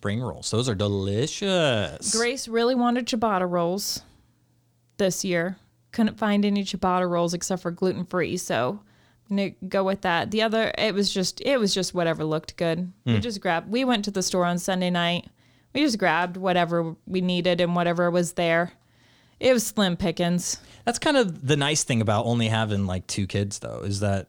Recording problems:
none

